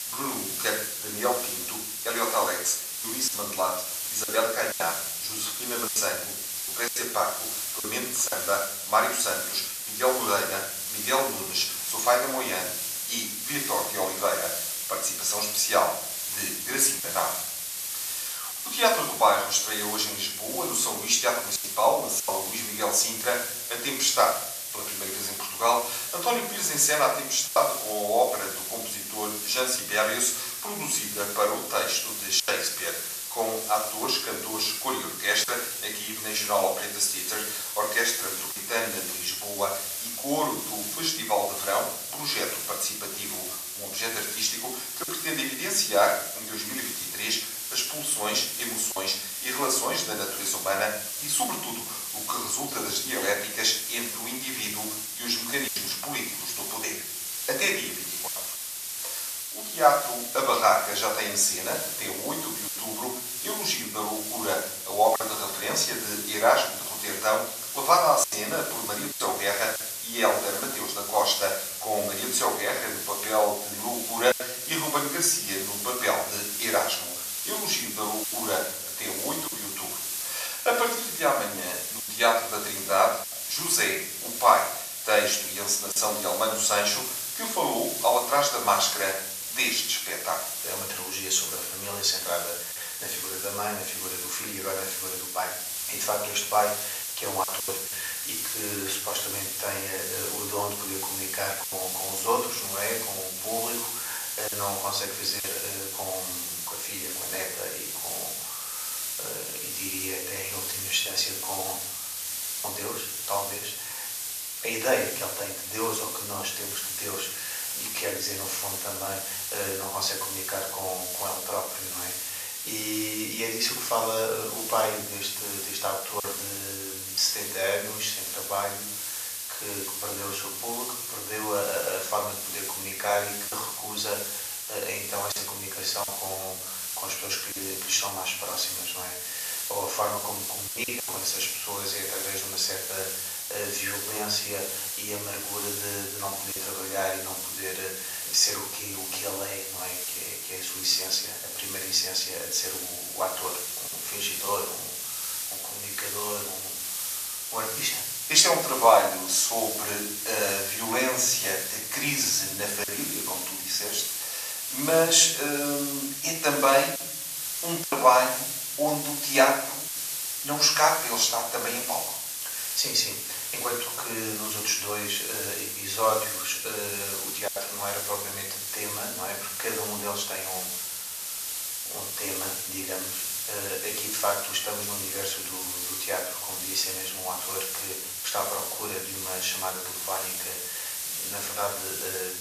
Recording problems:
off-mic speech; far
thin; very; fading below 700 Hz
room echo; noticeable; dies away in 0.8 s
hiss; loud; throughout; 3 dB below the speech
choppy; occasionally; 2% of the speech affected

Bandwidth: 14.5 kHz